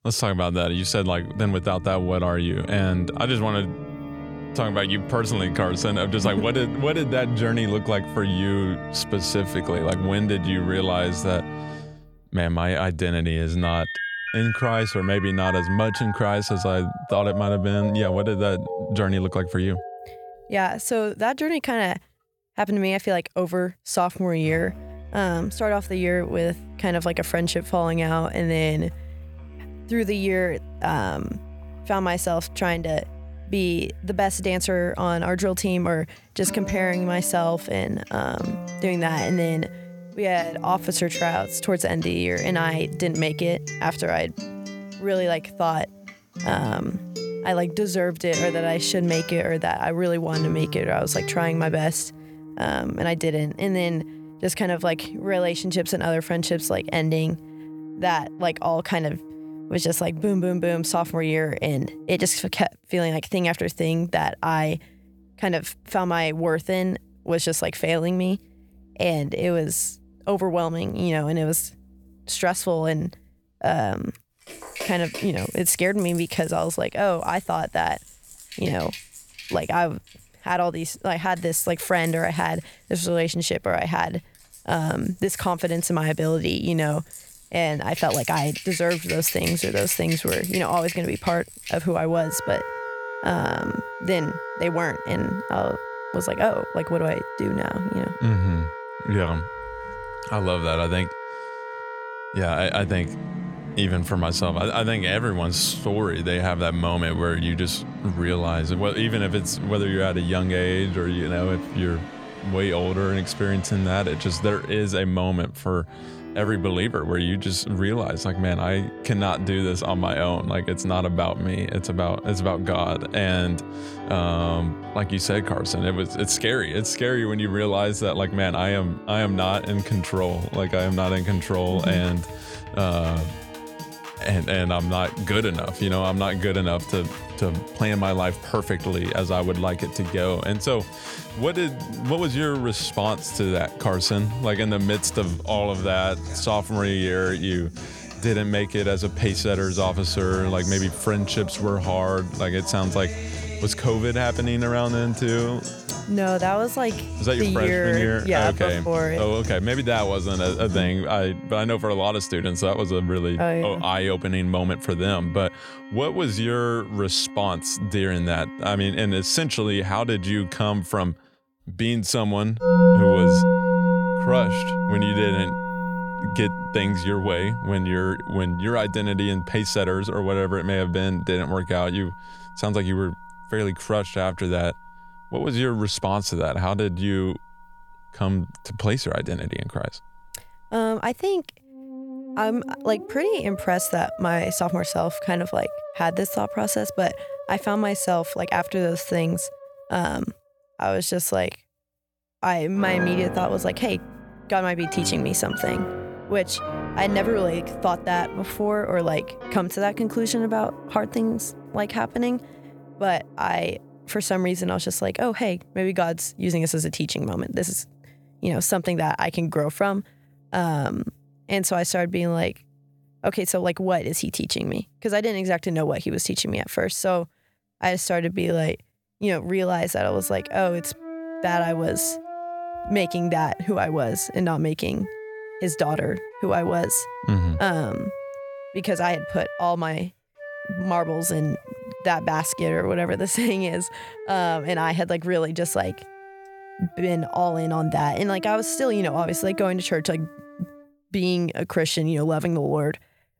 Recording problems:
background music; loud; throughout; 9 dB below the speech

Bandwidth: 18 kHz